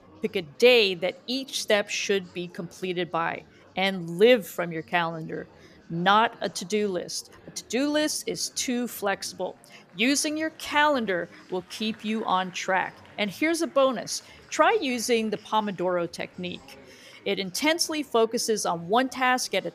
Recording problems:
murmuring crowd; faint; throughout; 25 dB below the speech

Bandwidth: 14.5 kHz